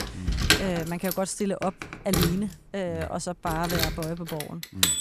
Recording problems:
household noises; very loud; throughout; 3 dB above the speech

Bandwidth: 14.5 kHz